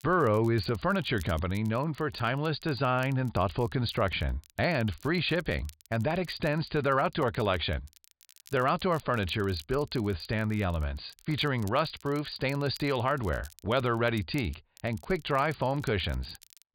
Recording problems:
high frequencies cut off; severe; nothing above 5 kHz
crackle, like an old record; faint; 25 dB below the speech

